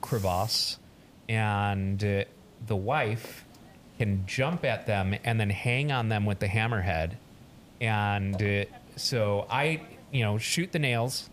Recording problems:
hiss; faint; throughout; 20 dB below the speech

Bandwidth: 15 kHz